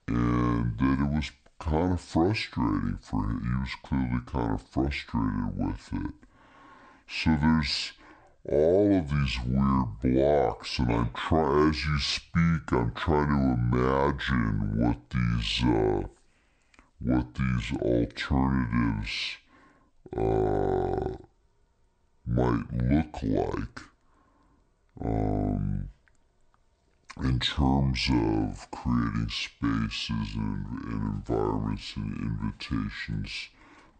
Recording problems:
wrong speed and pitch; too slow and too low; 0.6 times normal speed

